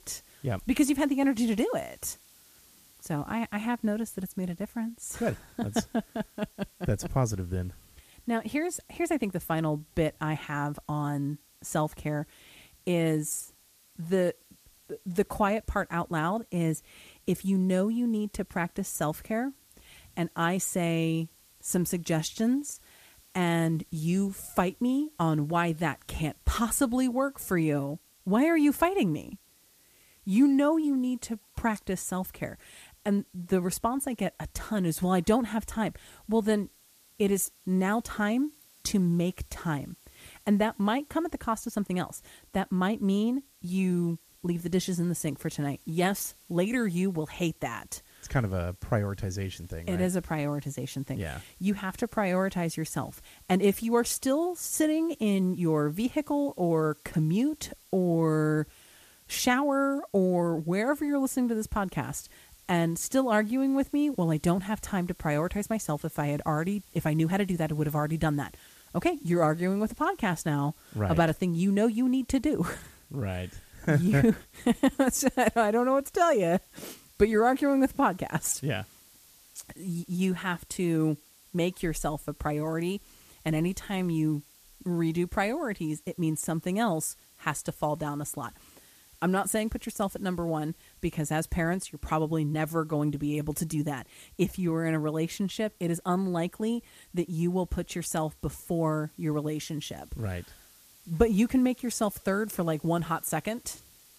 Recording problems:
hiss; faint; throughout; 25 dB below the speech

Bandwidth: 14.5 kHz